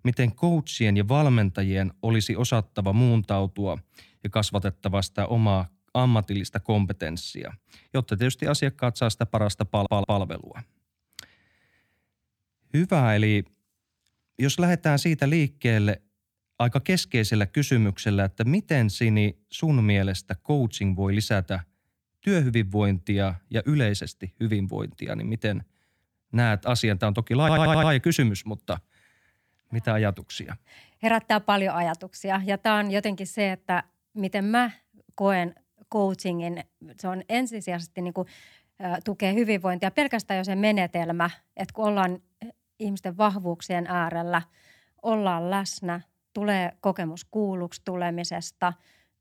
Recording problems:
audio stuttering; at 9.5 s and at 27 s

